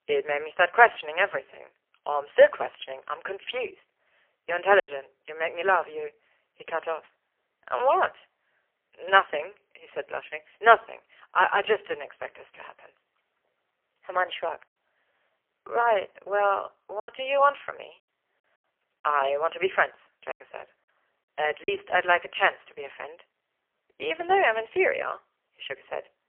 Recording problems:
phone-call audio; poor line; nothing above 3 kHz
thin; very; fading below 300 Hz
choppy; very; at 5 s, at 17 s and from 20 to 22 s; 6% of the speech affected

